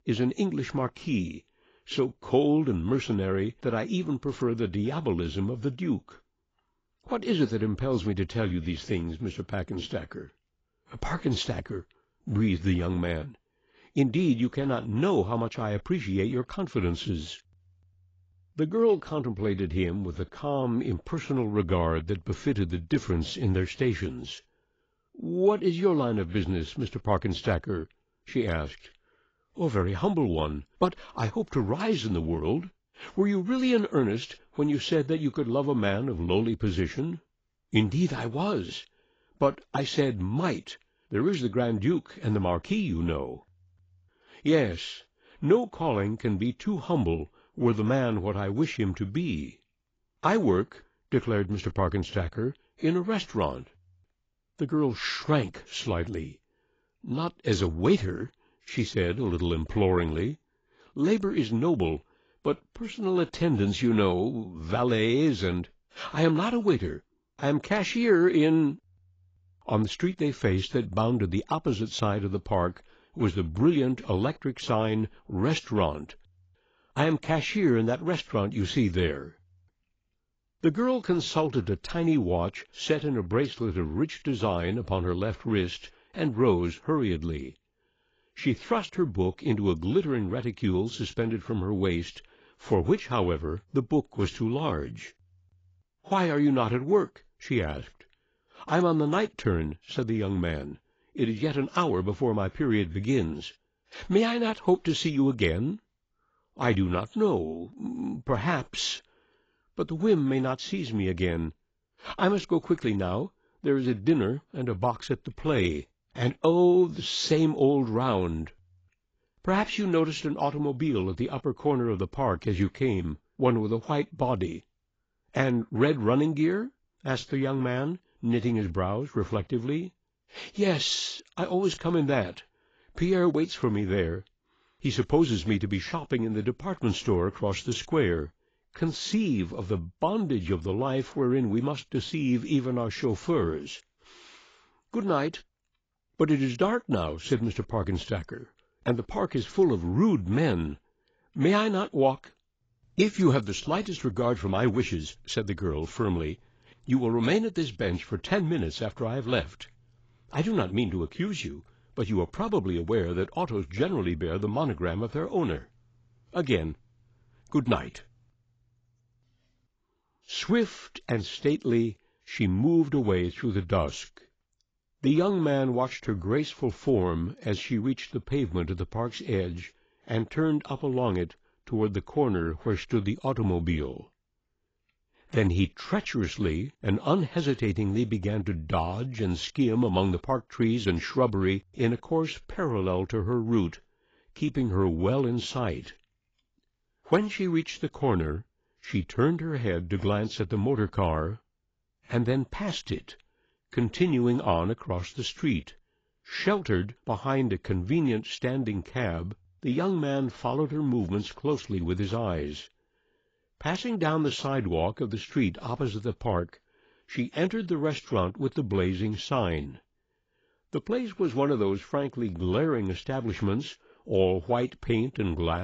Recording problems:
garbled, watery; badly; nothing above 7.5 kHz
abrupt cut into speech; at the end

